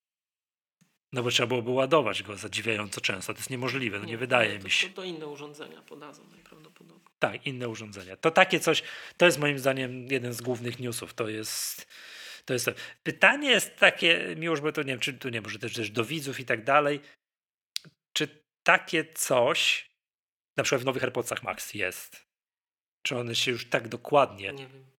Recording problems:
thin; somewhat; fading below 1 kHz
uneven, jittery; strongly; from 13 to 24 s

